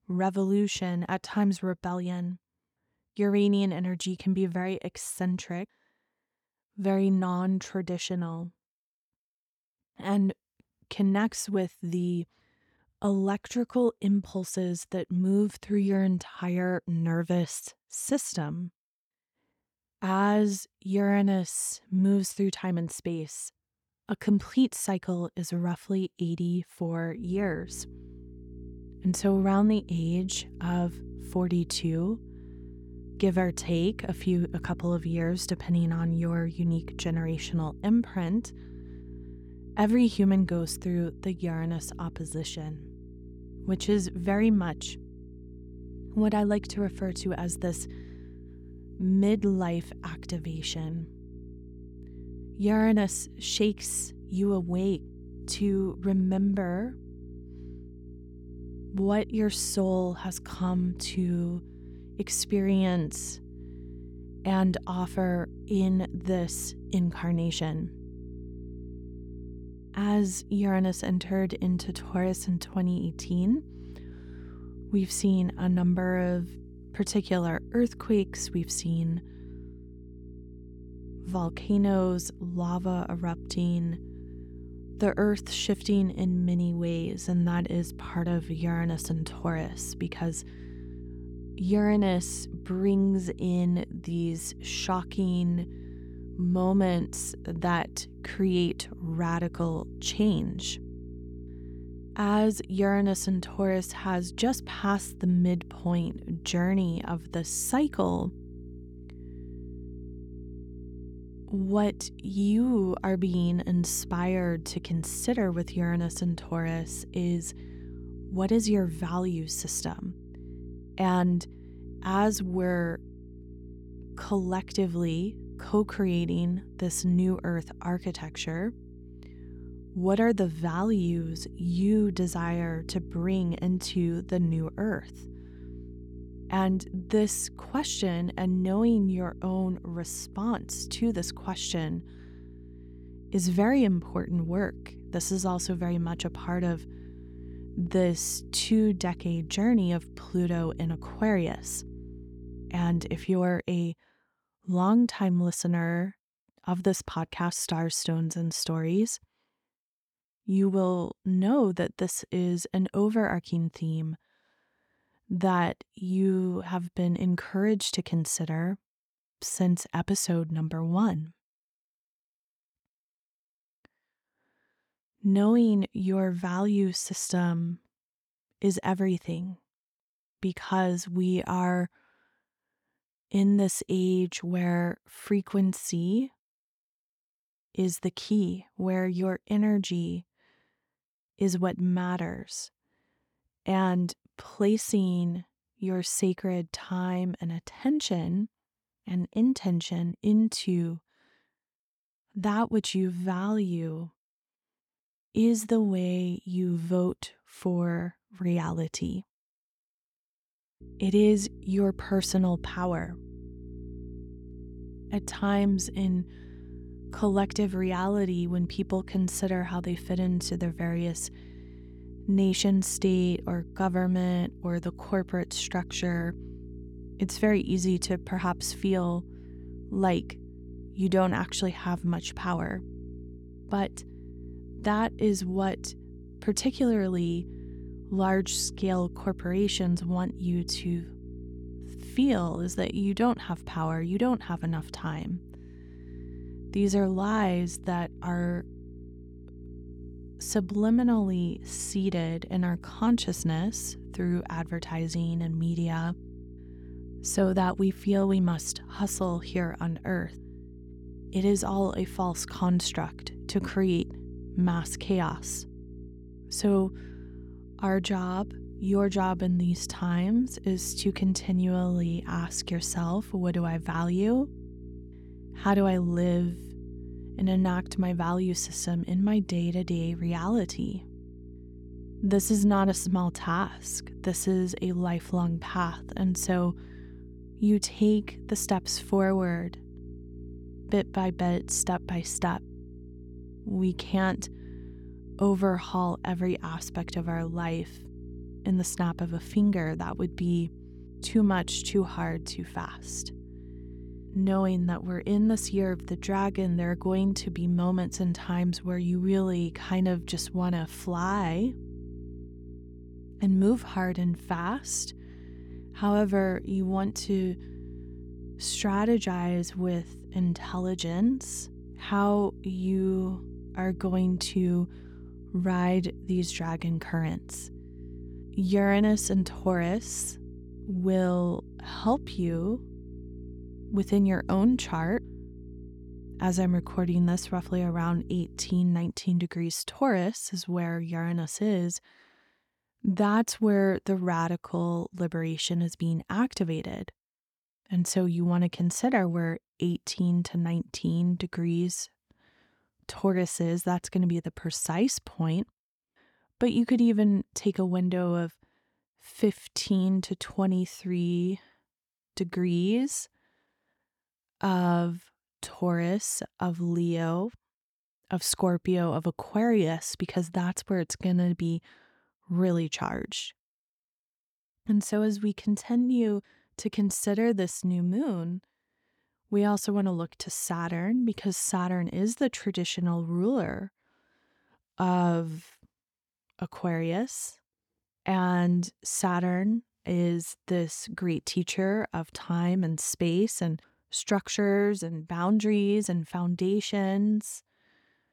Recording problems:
electrical hum; faint; from 27 s to 2:33 and from 3:31 to 5:39; 60 Hz, 20 dB below the speech

